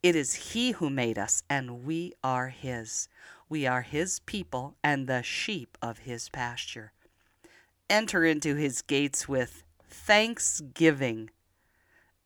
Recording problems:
none

